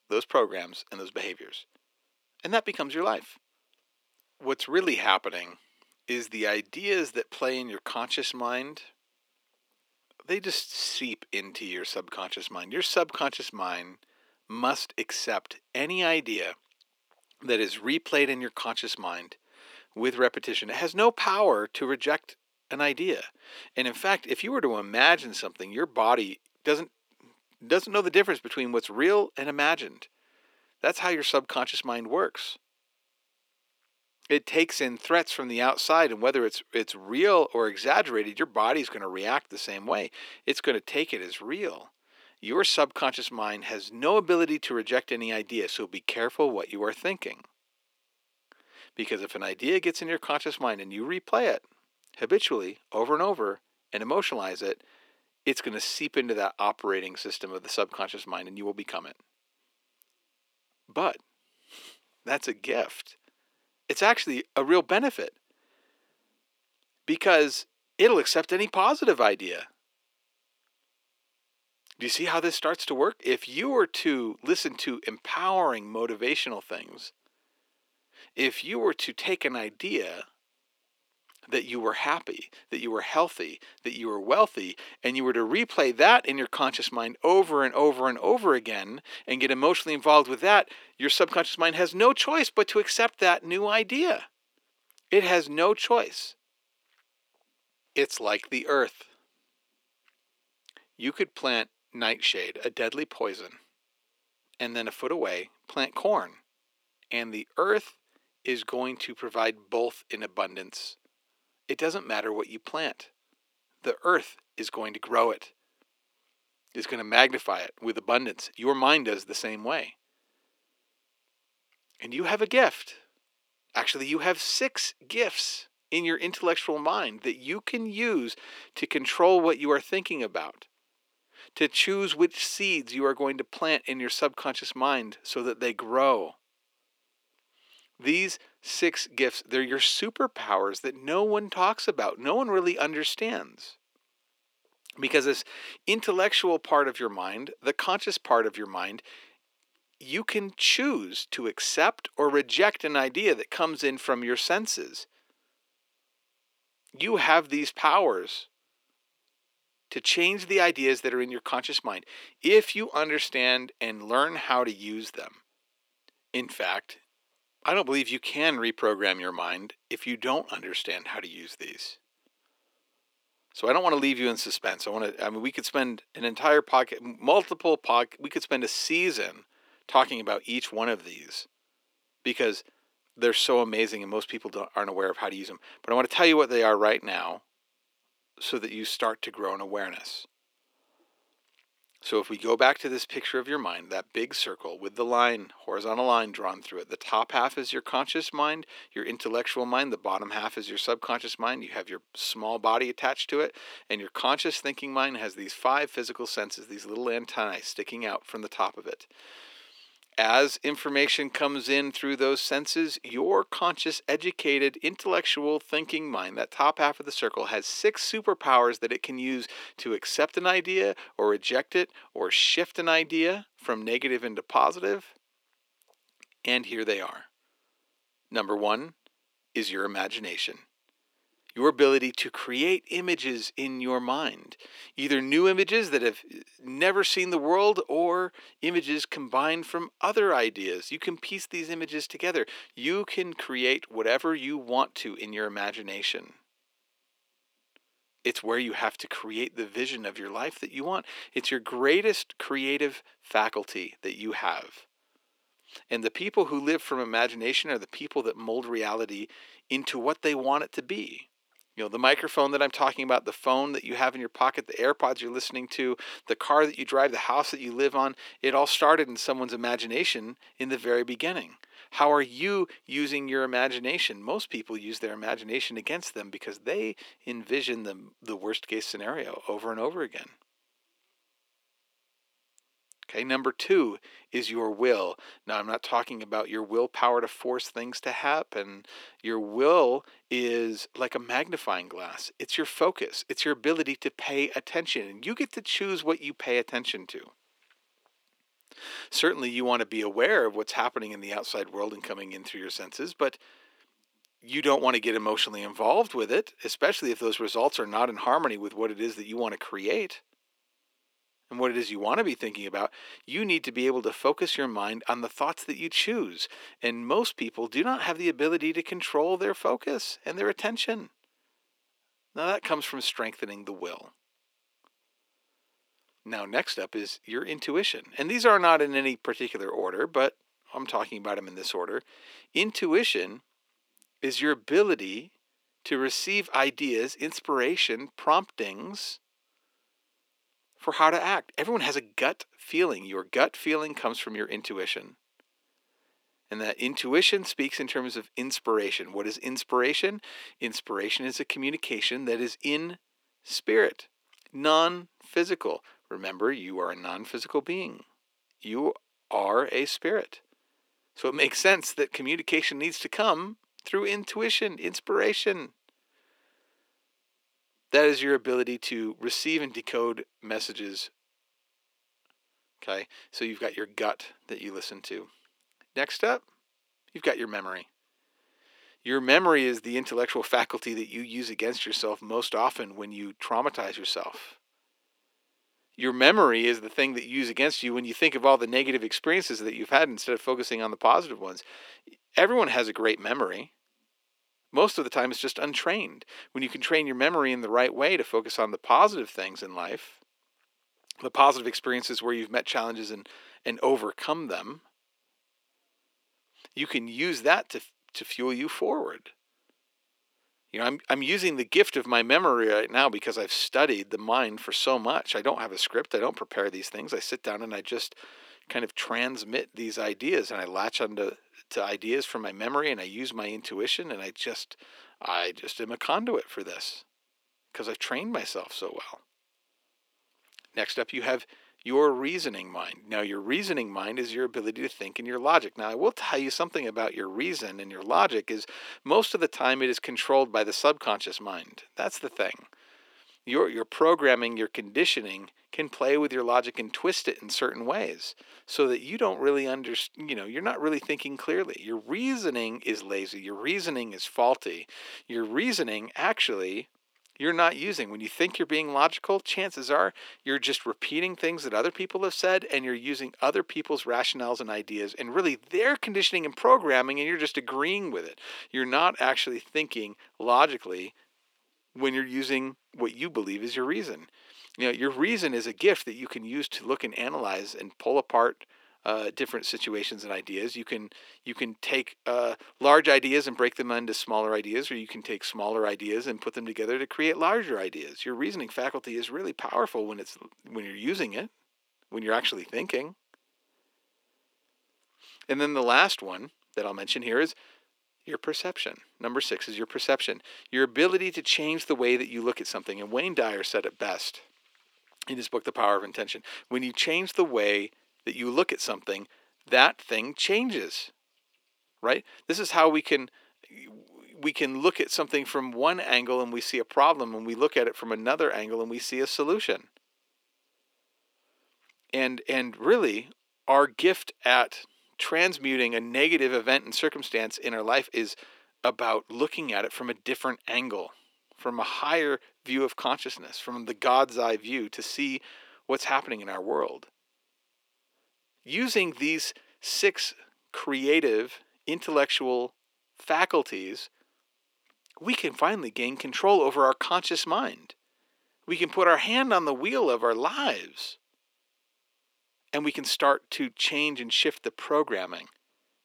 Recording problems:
thin; somewhat; fading below 300 Hz

